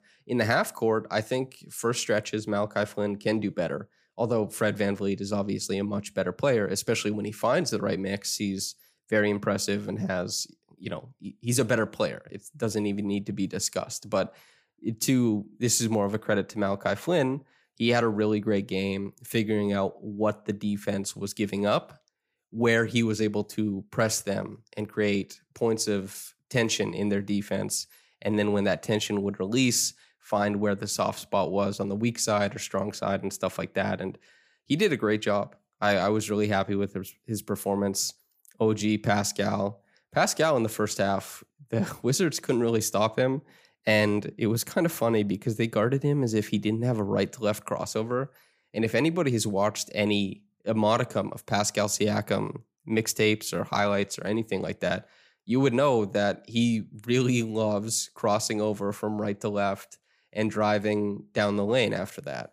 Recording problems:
none

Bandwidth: 15 kHz